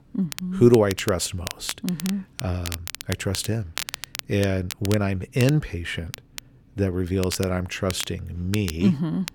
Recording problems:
crackle, like an old record; noticeable; 10 dB below the speech

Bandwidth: 17 kHz